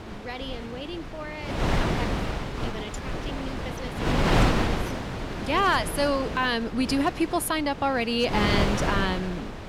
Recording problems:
wind noise on the microphone; heavy; 4 dB below the speech

